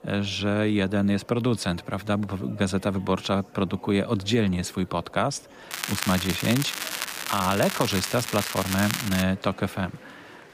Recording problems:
crackling; loud; from 5.5 to 9 s; 4 dB below the speech
murmuring crowd; faint; throughout; 20 dB below the speech

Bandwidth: 15 kHz